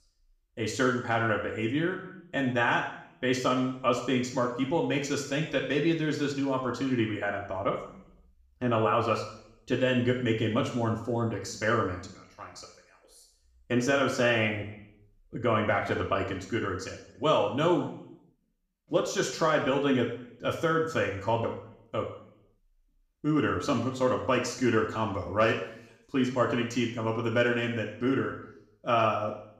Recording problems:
room echo; noticeable; dies away in 0.7 s
off-mic speech; somewhat distant

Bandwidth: 15 kHz